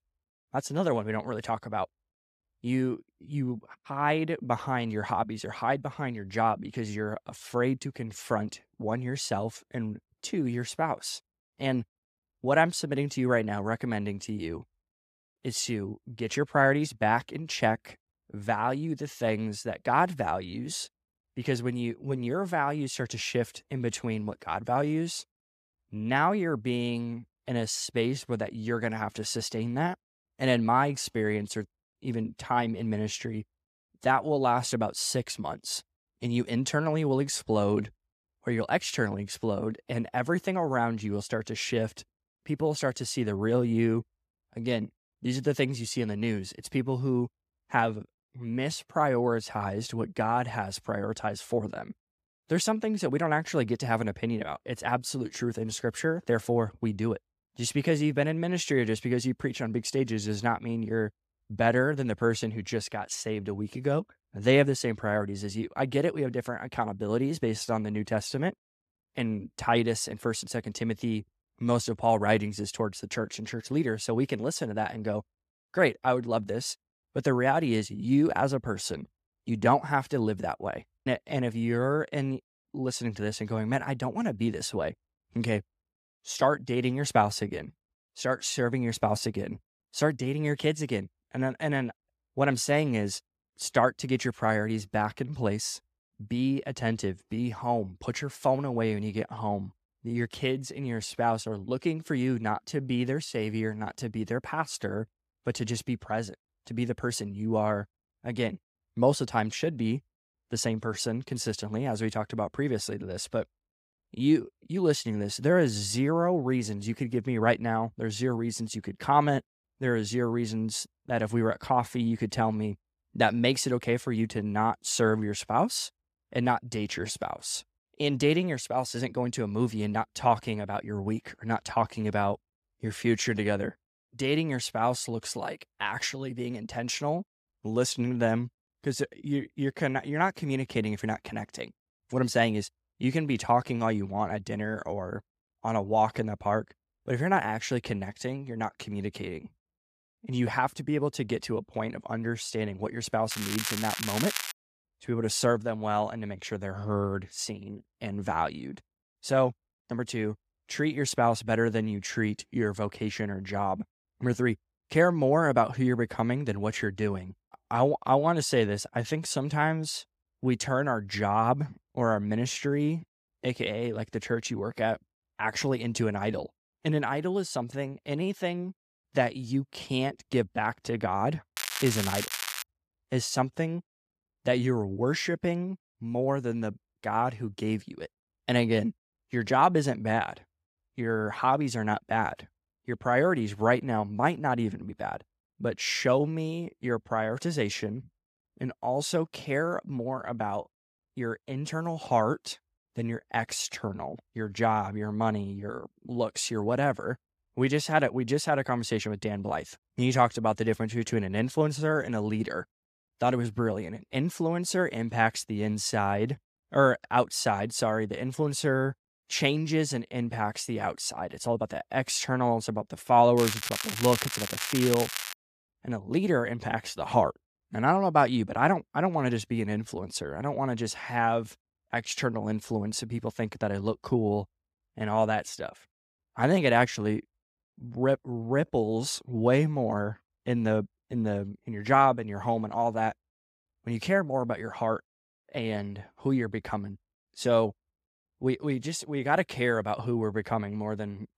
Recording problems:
crackling; loud; from 2:33 to 2:35, from 3:02 to 3:03 and from 3:43 to 3:45; 3 dB below the speech

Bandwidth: 14.5 kHz